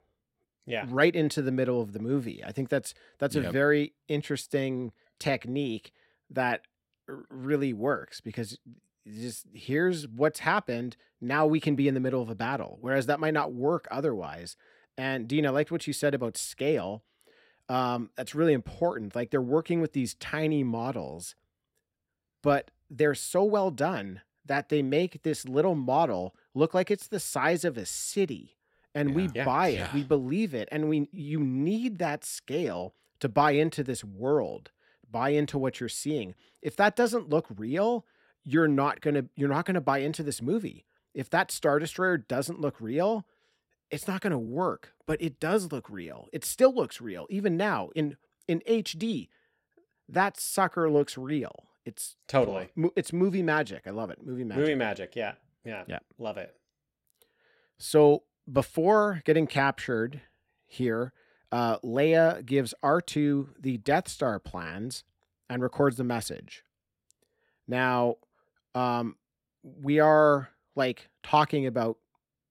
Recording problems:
uneven, jittery; slightly; from 0.5 s to 1:11

